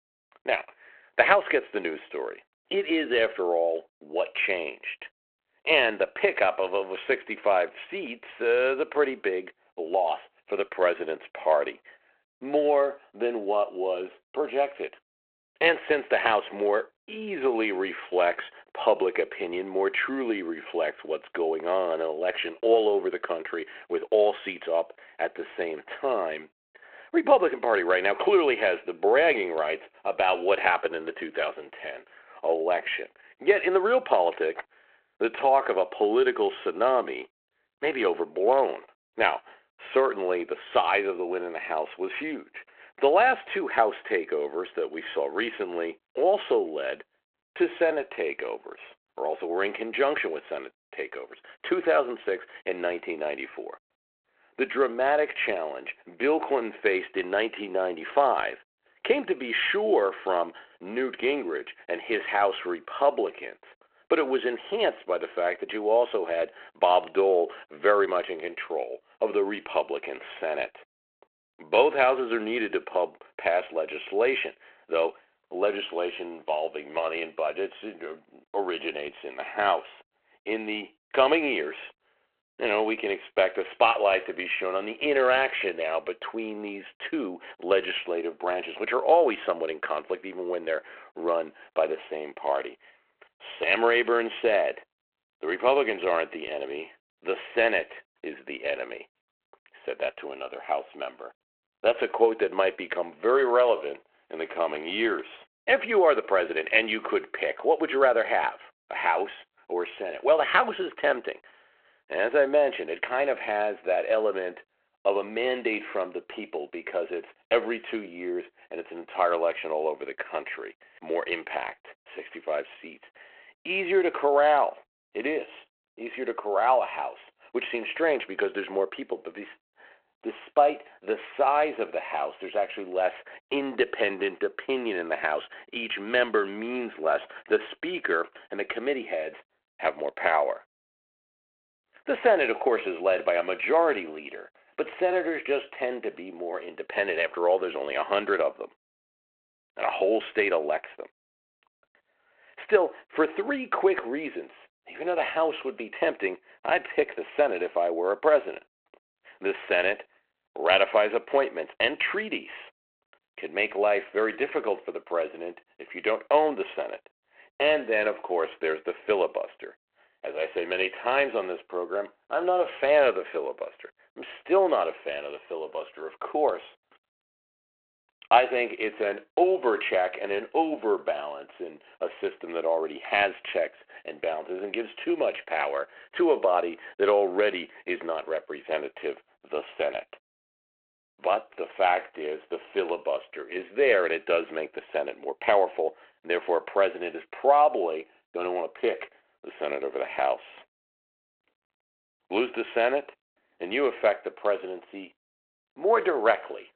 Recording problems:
phone-call audio

